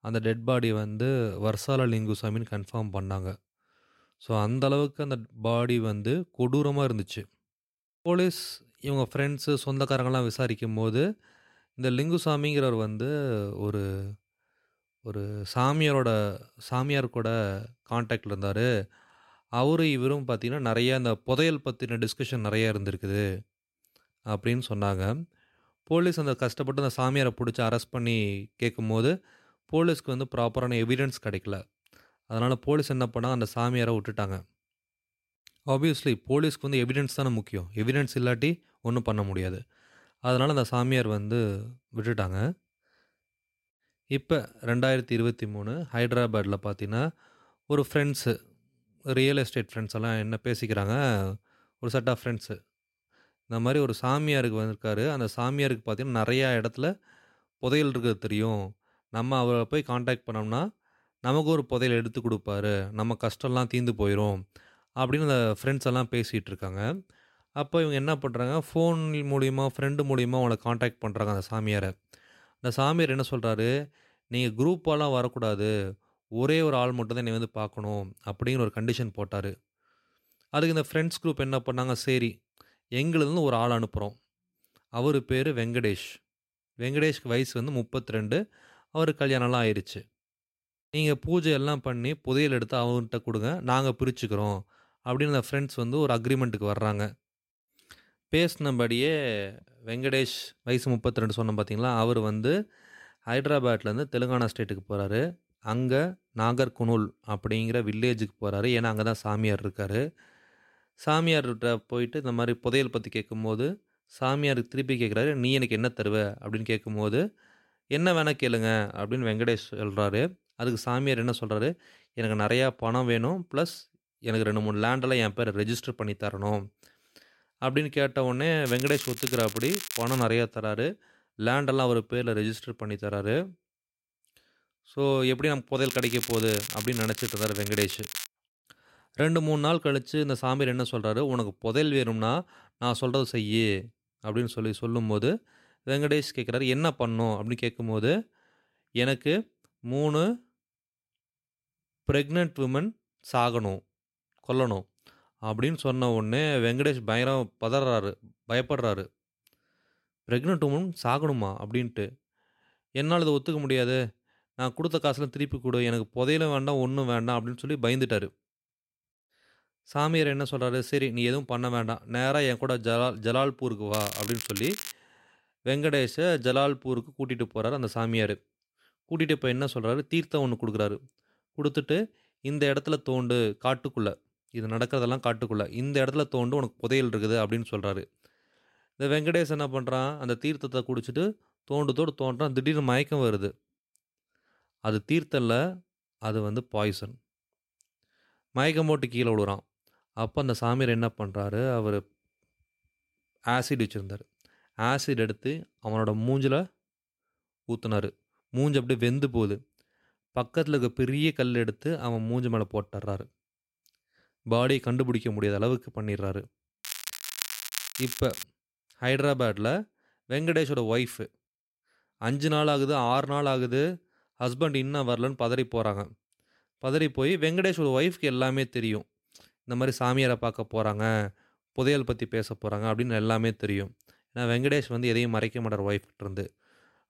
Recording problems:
crackling; loud; 4 times, first at 2:09; 6 dB below the speech

